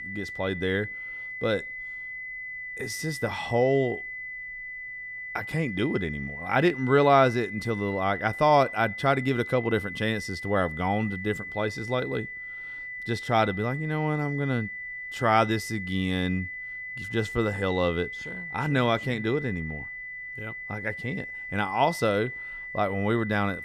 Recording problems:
high-pitched whine; loud; throughout; 2 kHz, 8 dB below the speech

